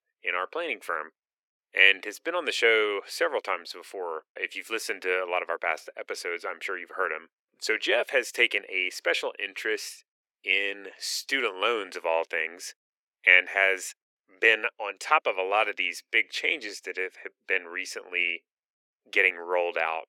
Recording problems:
thin; very; fading below 400 Hz

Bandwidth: 17 kHz